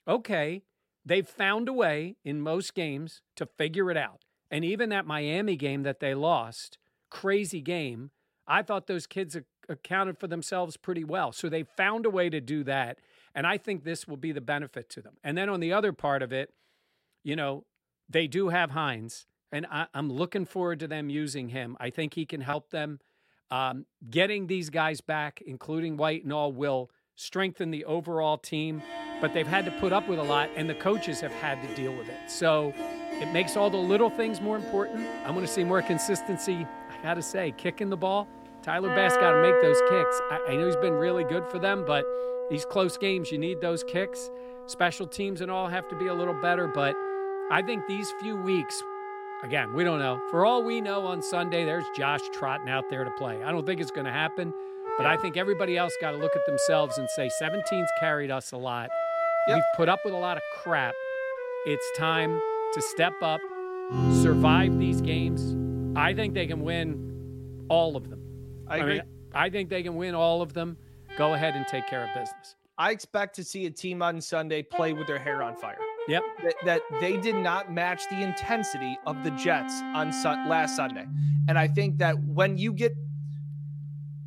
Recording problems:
background music; loud; from 29 s on; 1 dB below the speech

